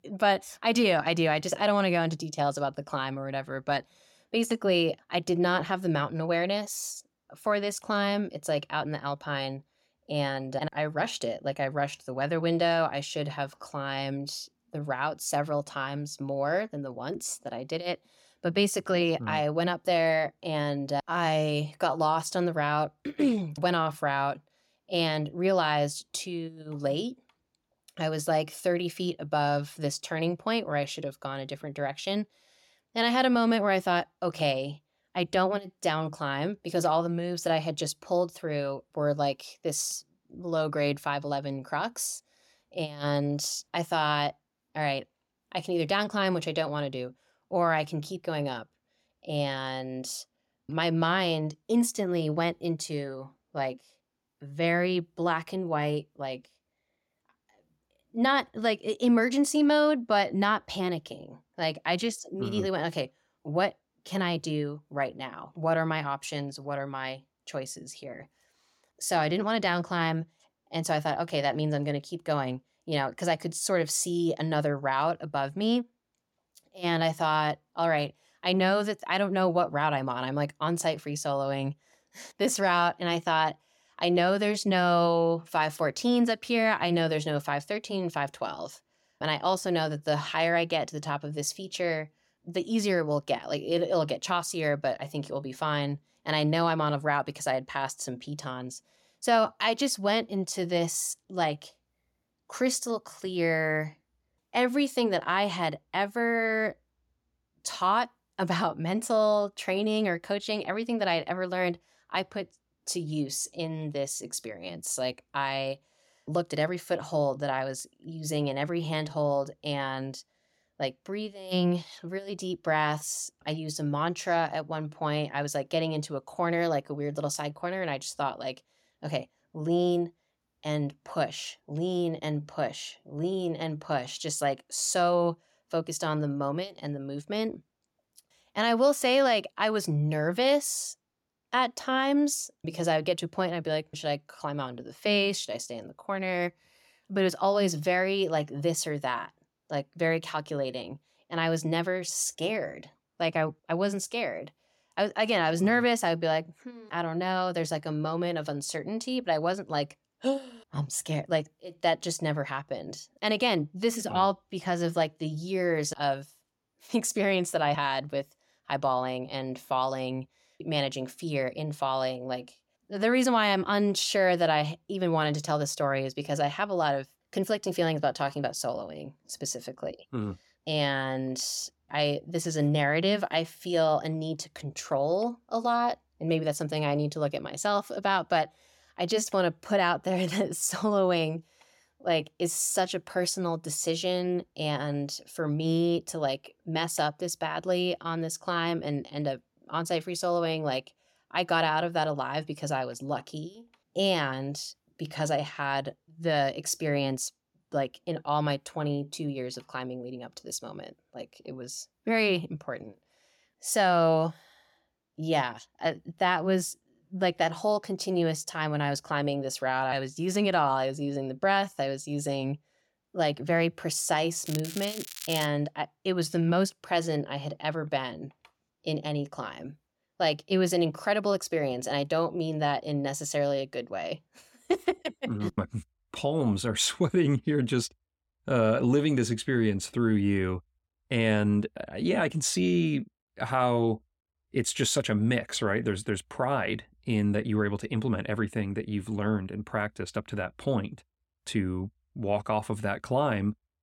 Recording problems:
crackling; loud; from 3:44 to 3:45; 10 dB below the speech

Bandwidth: 17 kHz